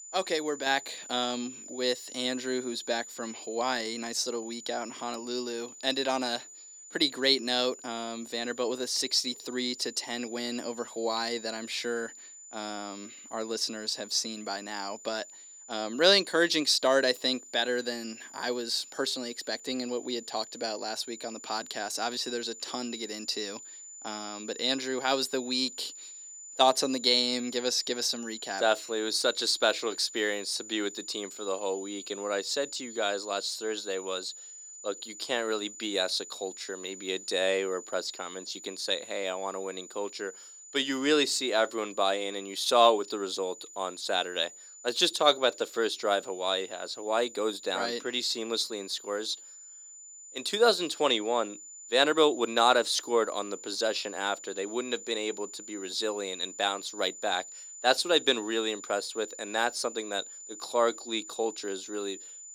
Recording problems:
thin; somewhat; fading below 300 Hz
high-pitched whine; noticeable; throughout; 7 kHz, 15 dB below the speech

